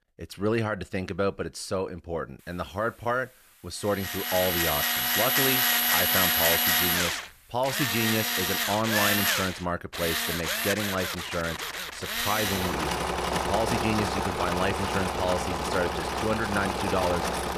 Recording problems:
machinery noise; very loud; from 4 s on; 4 dB above the speech
hiss; faint; from 2.5 to 9 s; 25 dB below the speech

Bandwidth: 14.5 kHz